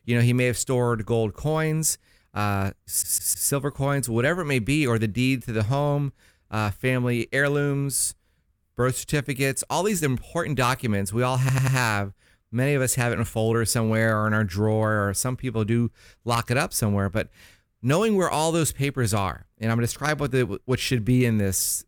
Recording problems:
audio stuttering; at 3 s and at 11 s

